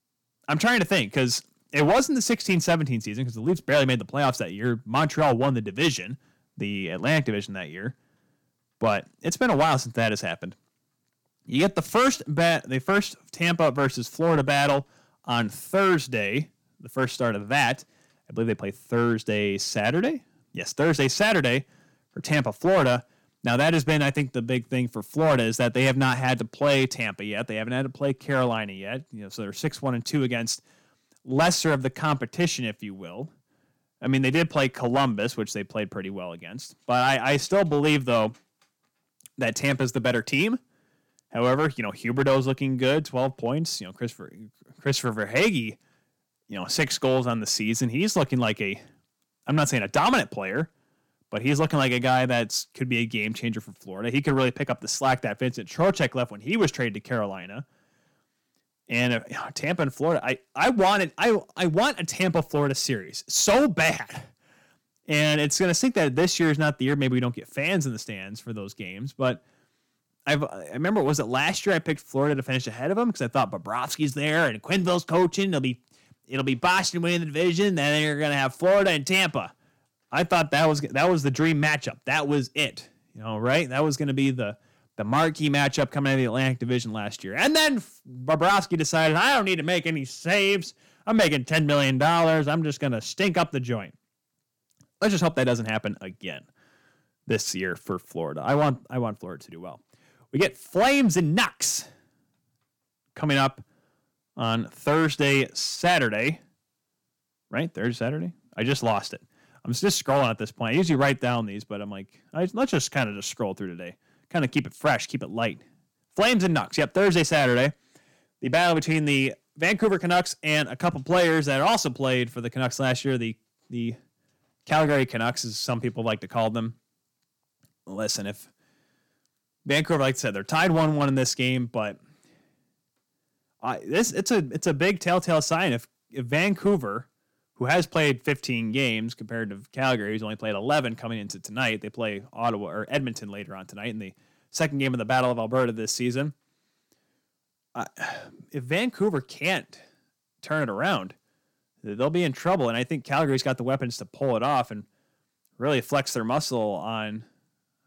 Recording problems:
distortion; slight; 4% of the sound clipped

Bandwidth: 17.5 kHz